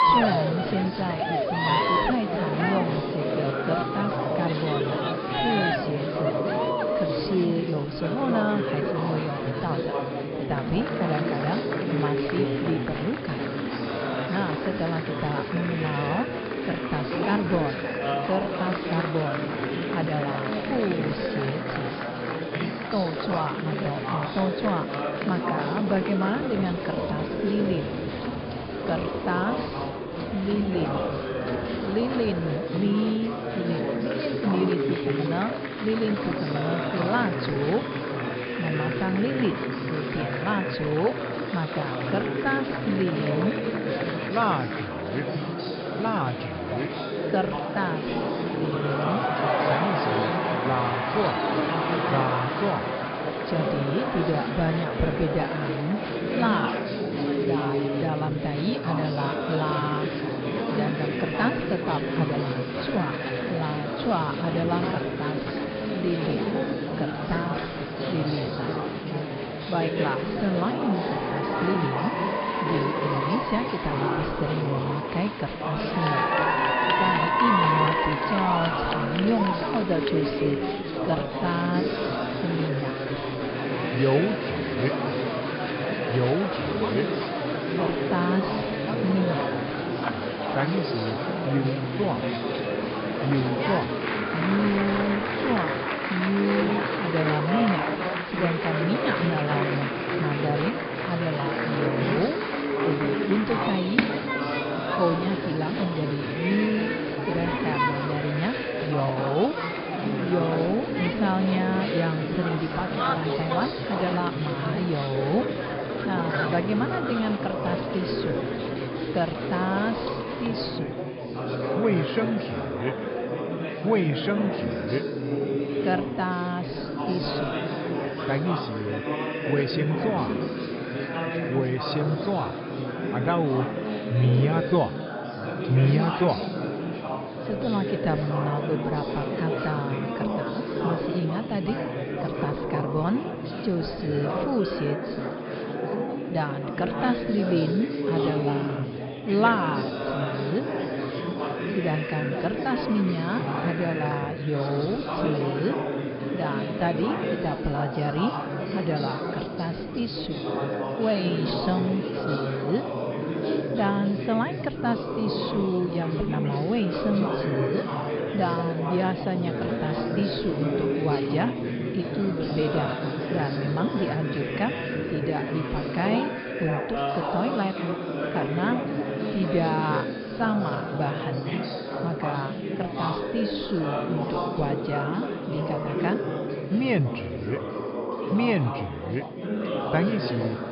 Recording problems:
high frequencies cut off; noticeable; nothing above 5 kHz
murmuring crowd; very loud; throughout; as loud as the speech

